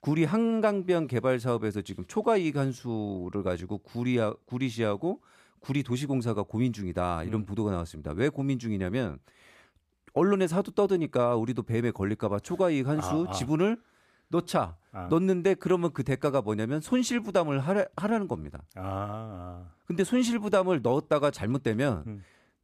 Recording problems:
none

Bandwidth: 14.5 kHz